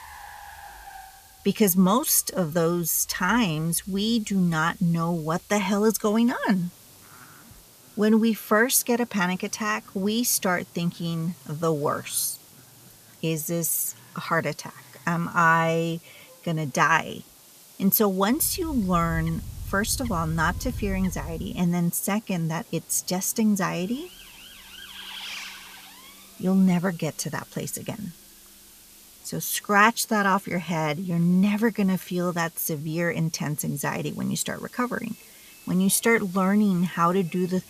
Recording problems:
animal sounds; noticeable; until 21 s; 15 dB below the speech
traffic noise; faint; throughout; 25 dB below the speech
hiss; faint; throughout; 25 dB below the speech

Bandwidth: 14.5 kHz